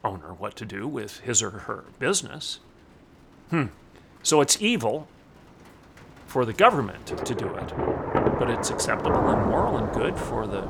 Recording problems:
rain or running water; loud; throughout; 1 dB below the speech

